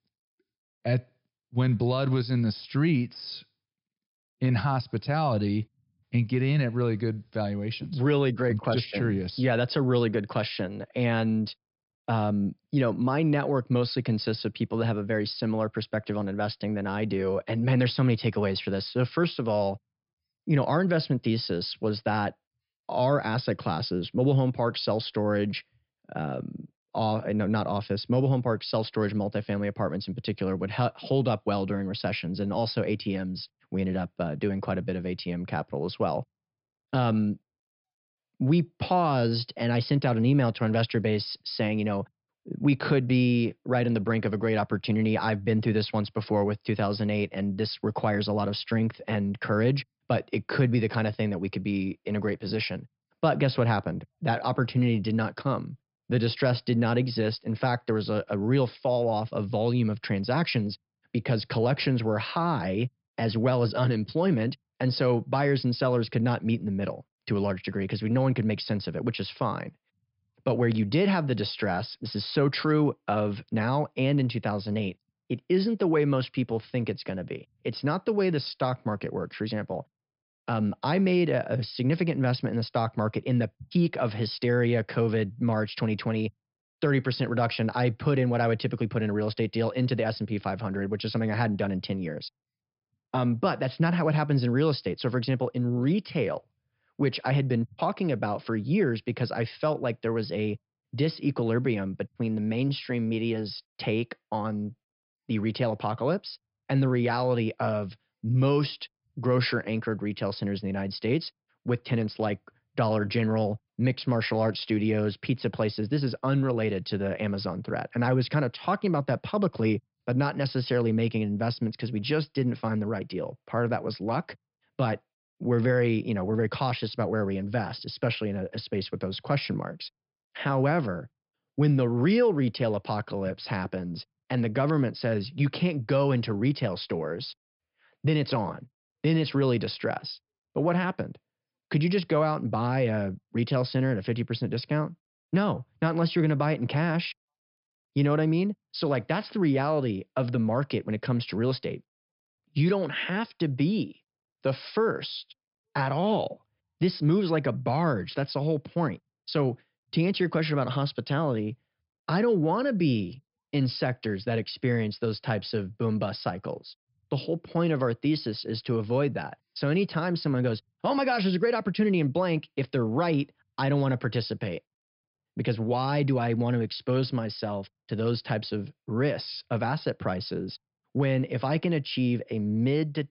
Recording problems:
high frequencies cut off; noticeable; nothing above 5.5 kHz

